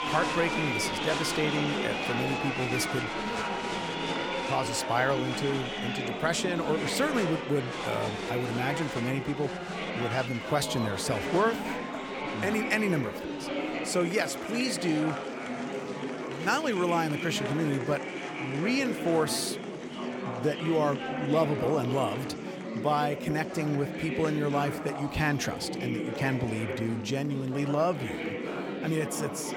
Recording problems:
chatter from many people; loud; throughout; 3 dB below the speech

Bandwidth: 17 kHz